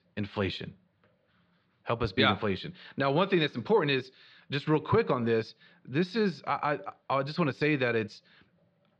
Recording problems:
muffled; very slightly; fading above 4.5 kHz

